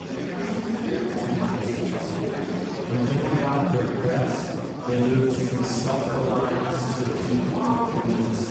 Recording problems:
room echo; strong; dies away in 1.2 s
off-mic speech; far
garbled, watery; badly; nothing above 7.5 kHz
murmuring crowd; loud; throughout; 2 dB below the speech
uneven, jittery; strongly; from 1 to 8 s

